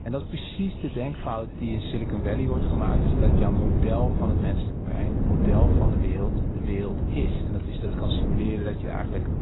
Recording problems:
garbled, watery; badly; nothing above 4 kHz
wind noise on the microphone; heavy; as loud as the speech
rain or running water; noticeable; throughout; 10 dB below the speech

